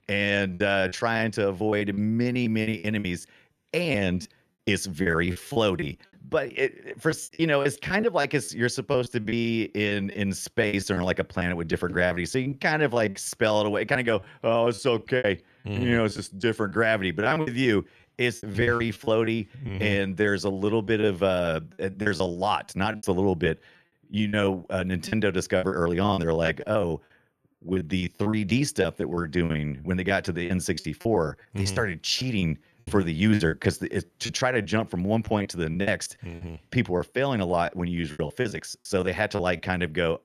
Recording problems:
choppy; very; 14% of the speech affected

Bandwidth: 13.5 kHz